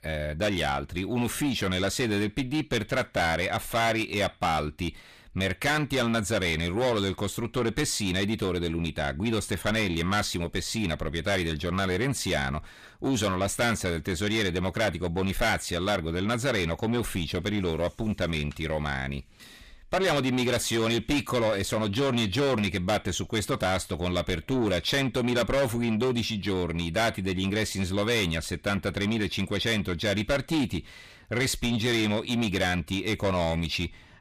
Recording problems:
distortion; heavy; 7 dB below the speech

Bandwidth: 14.5 kHz